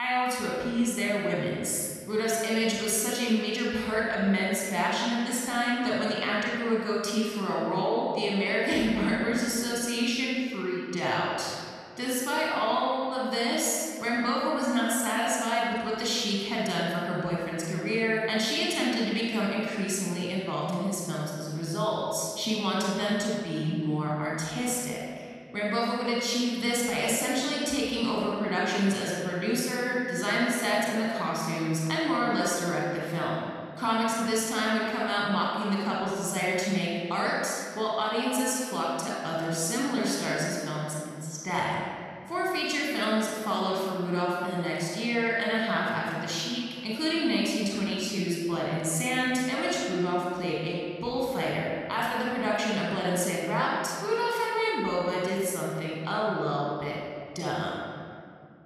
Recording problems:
room echo; strong; dies away in 2 s
off-mic speech; far
abrupt cut into speech; at the start

